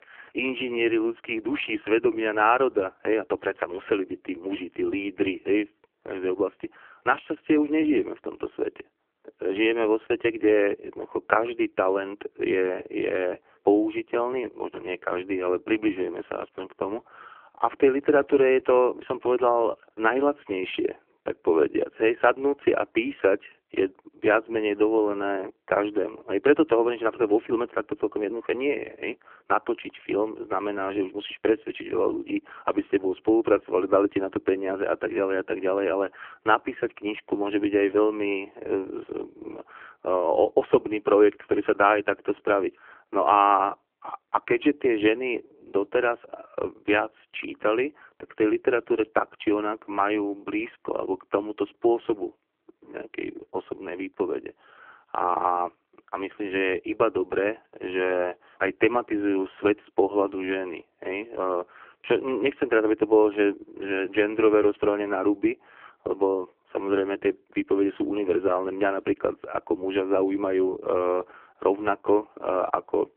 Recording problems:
phone-call audio; poor line

